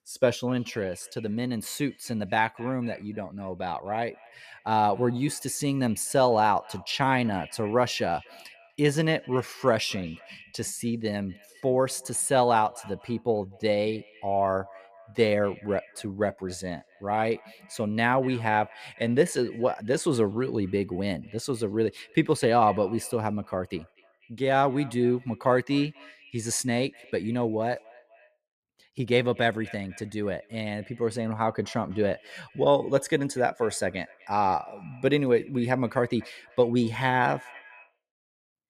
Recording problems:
echo of what is said; faint; throughout; 250 ms later, 25 dB below the speech

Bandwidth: 14.5 kHz